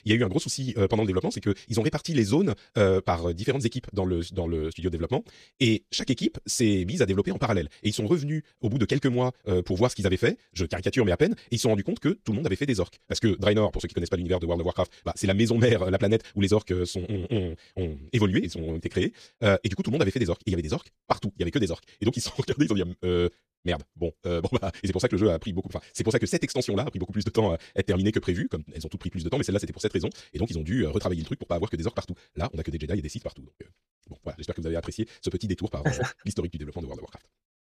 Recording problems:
wrong speed, natural pitch; too fast; 1.7 times normal speed

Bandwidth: 14 kHz